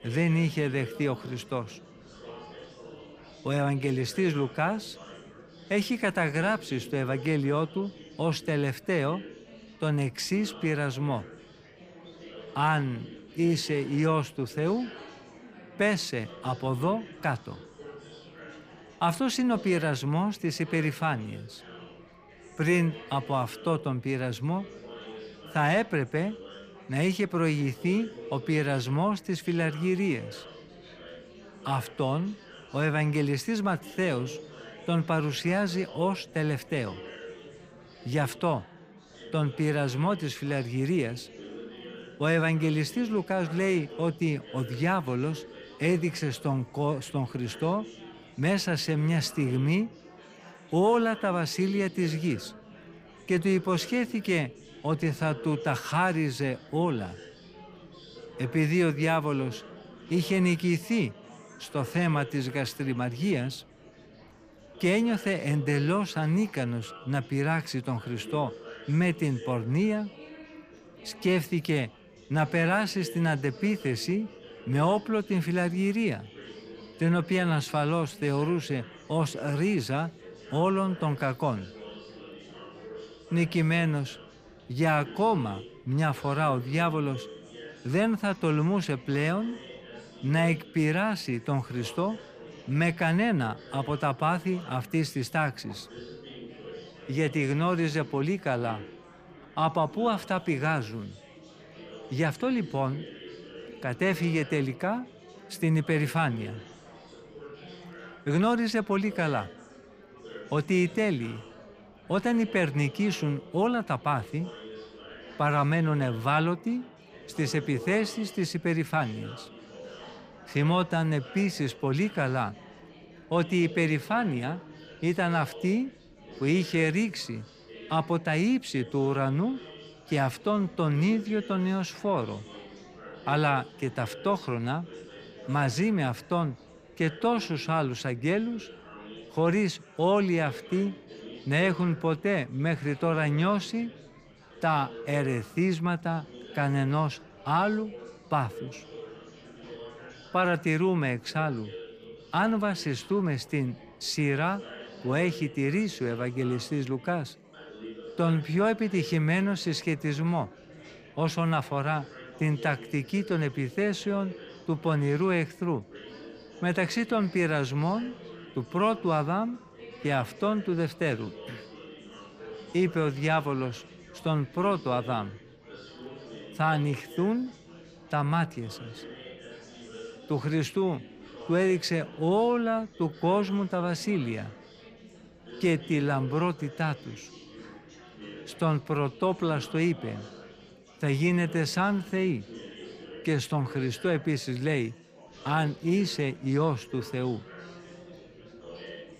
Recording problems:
chatter from many people; noticeable; throughout; 20 dB below the speech

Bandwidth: 15 kHz